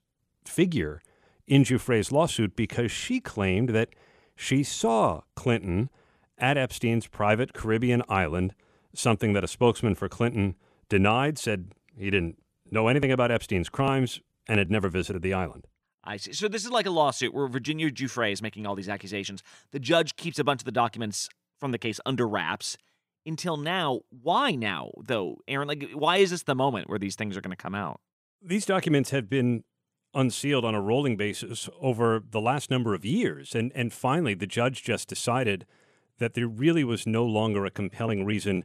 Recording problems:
none

